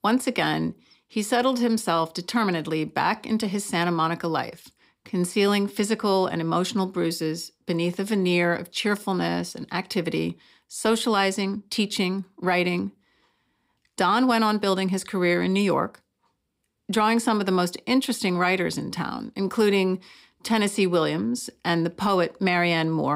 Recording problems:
abrupt cut into speech; at the end

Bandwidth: 15.5 kHz